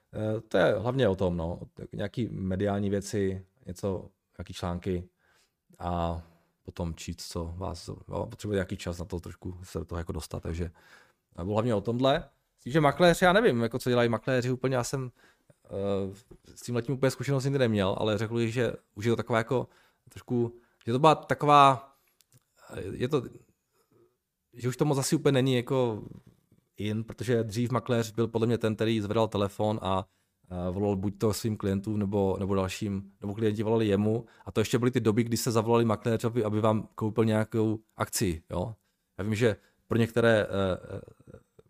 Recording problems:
none

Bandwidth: 15 kHz